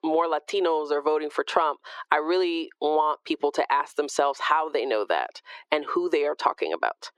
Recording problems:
thin; very; fading below 350 Hz
muffled; very slightly; fading above 3.5 kHz
squashed, flat; somewhat

